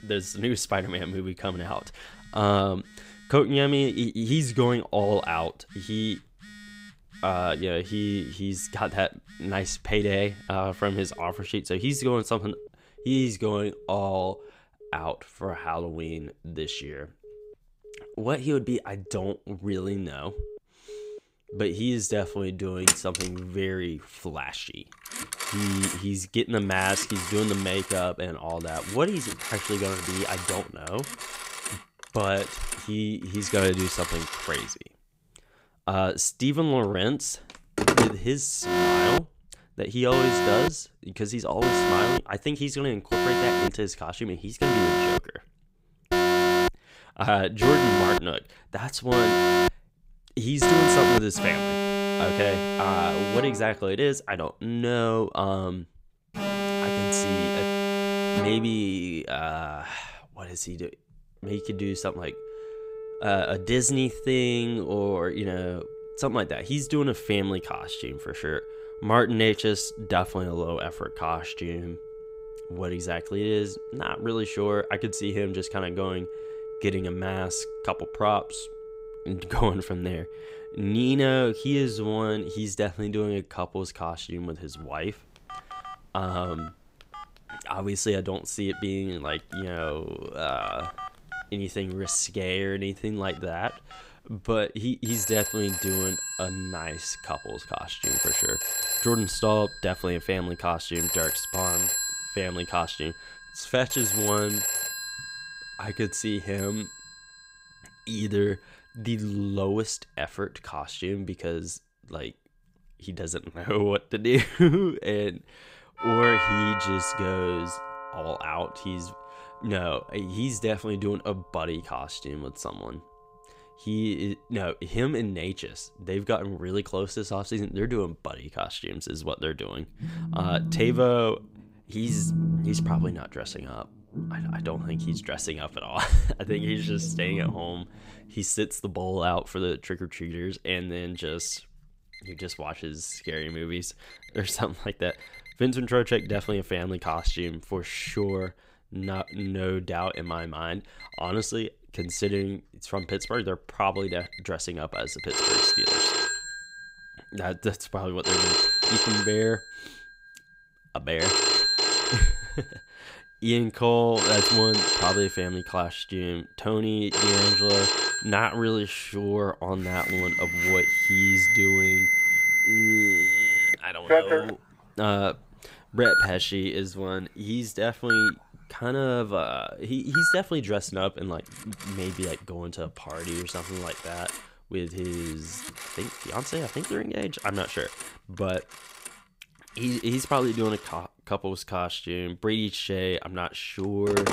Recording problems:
alarms or sirens; very loud; throughout; 3 dB above the speech

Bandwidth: 15.5 kHz